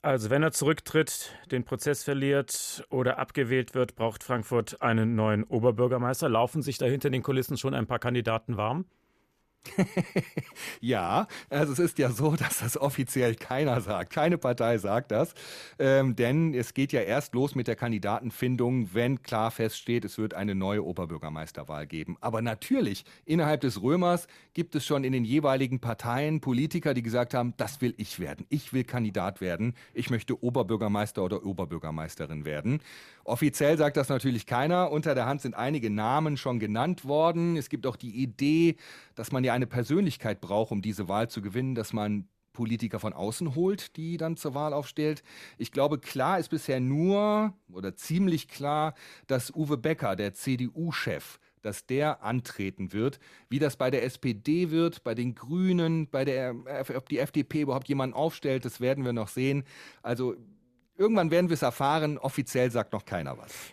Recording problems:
none

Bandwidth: 14.5 kHz